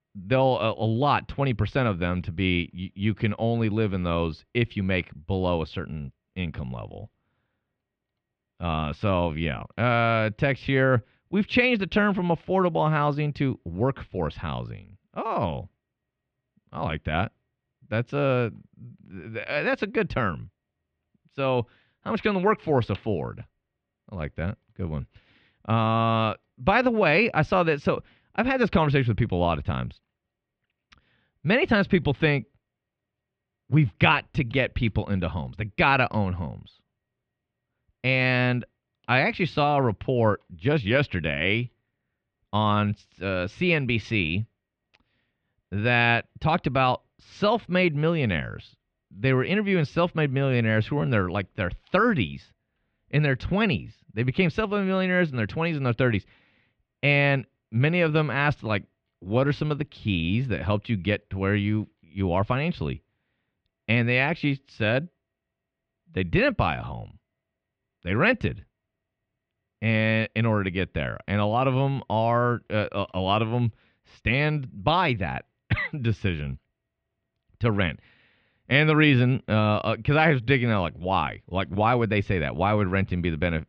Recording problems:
muffled; very; fading above 3 kHz

